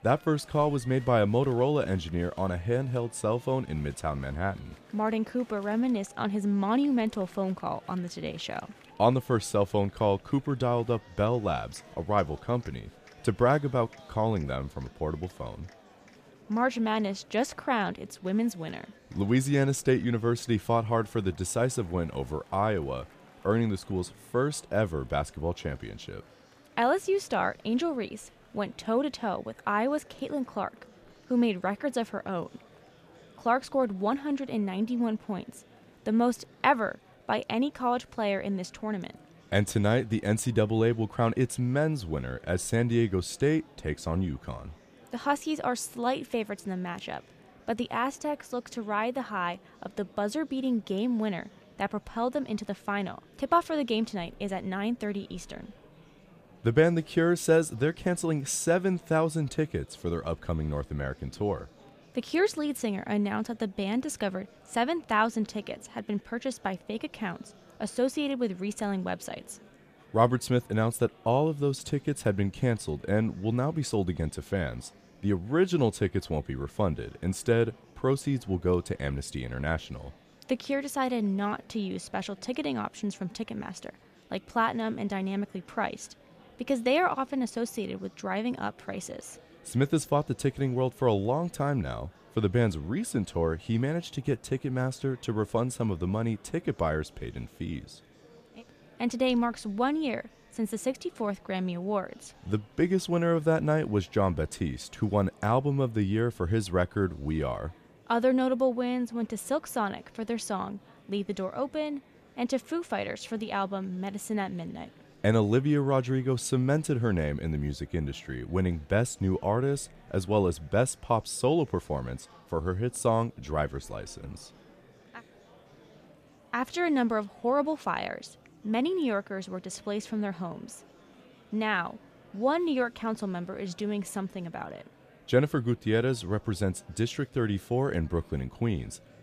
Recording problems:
murmuring crowd; faint; throughout; 25 dB below the speech

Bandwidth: 14.5 kHz